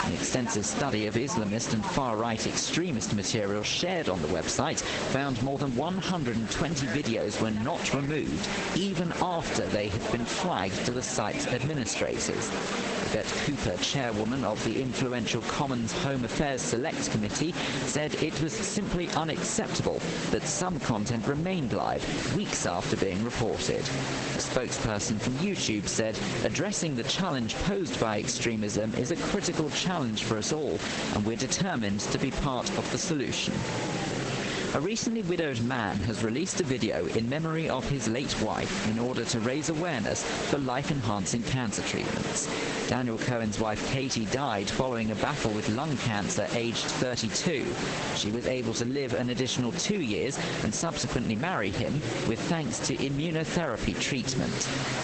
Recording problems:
garbled, watery; badly; nothing above 8 kHz
squashed, flat; heavily, background pumping
murmuring crowd; loud; throughout; 8 dB below the speech
hiss; loud; throughout; 10 dB below the speech

